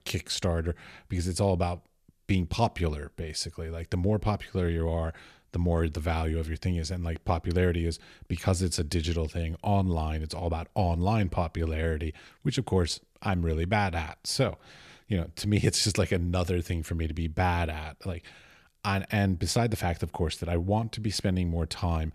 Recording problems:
none

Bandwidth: 14.5 kHz